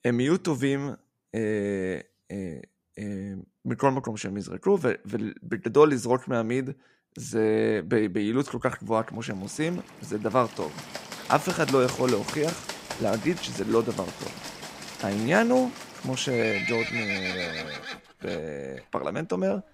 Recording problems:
animal sounds; loud; from 9.5 s on; 7 dB below the speech

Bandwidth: 15.5 kHz